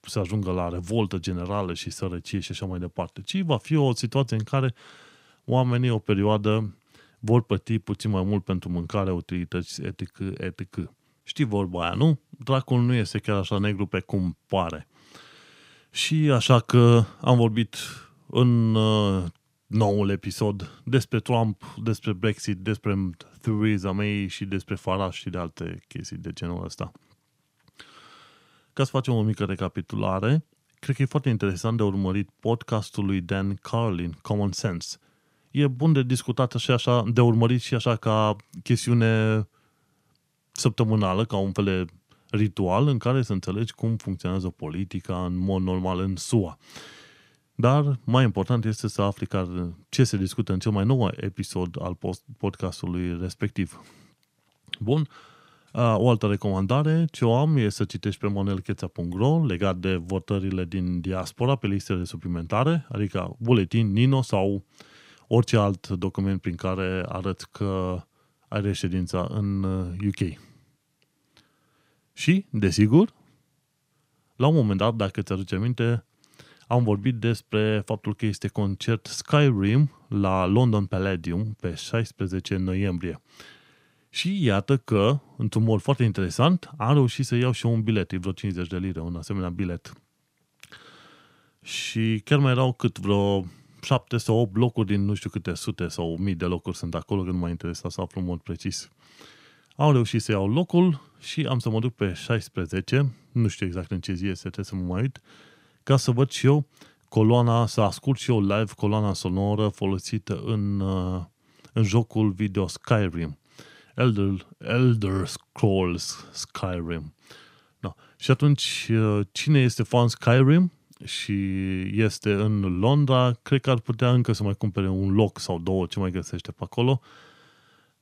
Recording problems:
none

